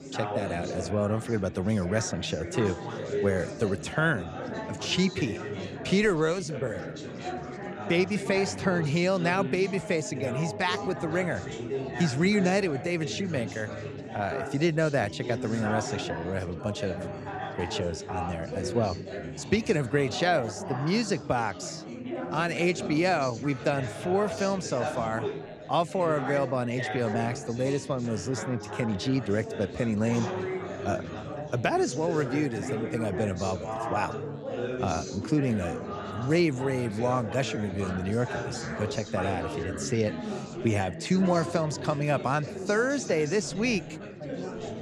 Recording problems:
chatter from many people; loud; throughout; 7 dB below the speech

